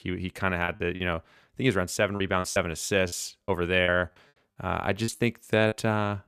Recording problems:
choppy; very; 9% of the speech affected

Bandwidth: 14.5 kHz